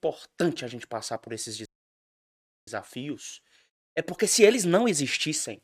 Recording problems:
audio cutting out; at 1.5 s for 1 s

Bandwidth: 14.5 kHz